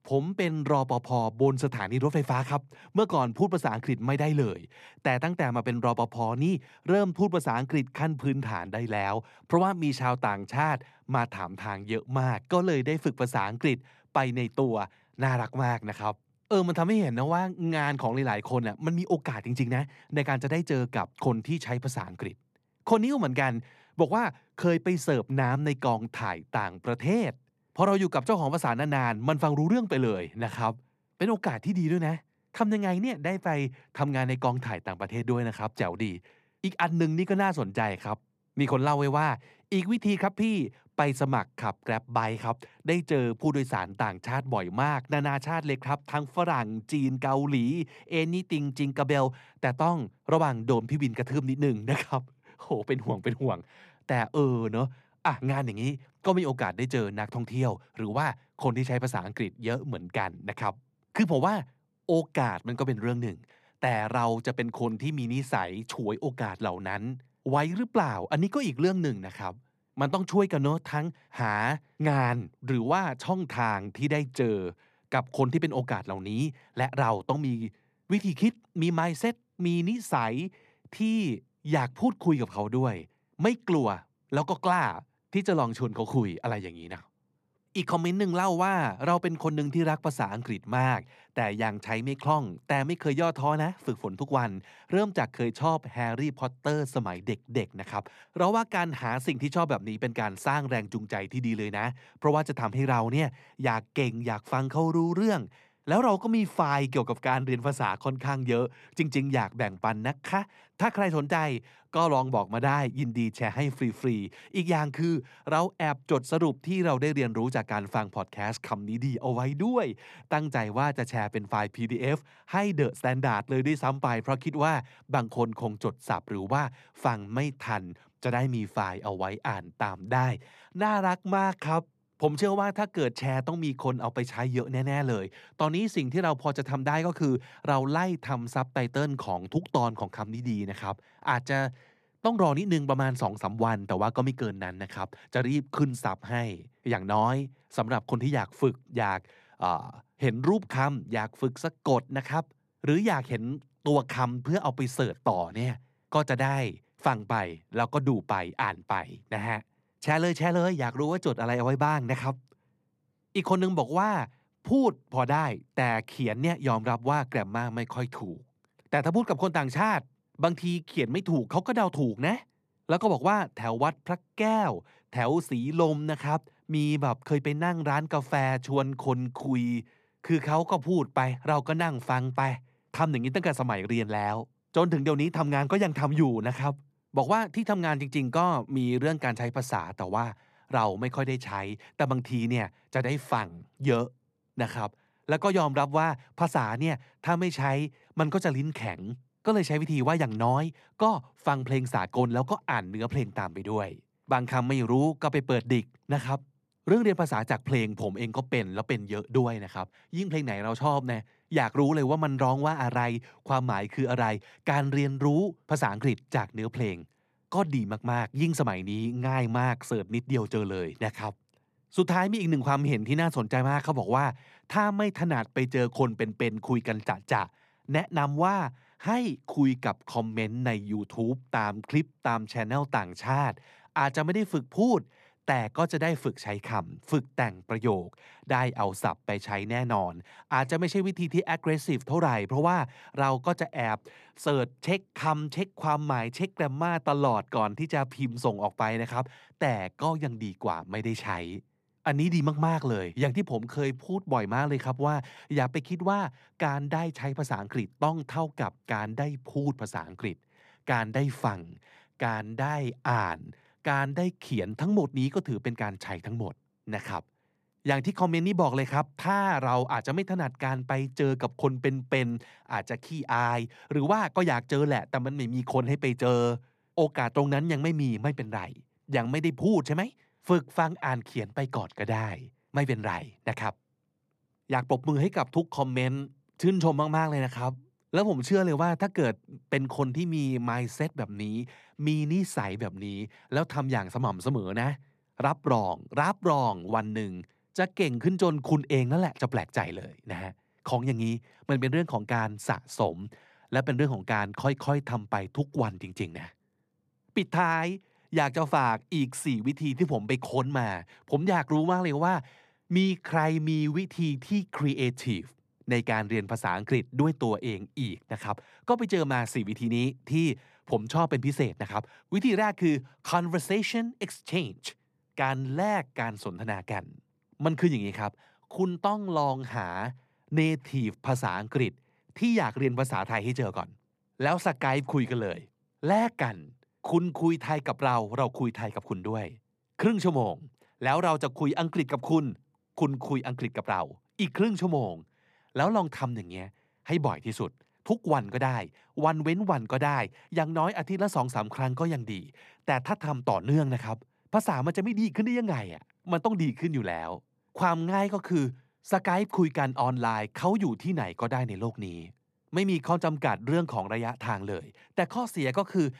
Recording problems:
muffled; slightly; fading above 2 kHz

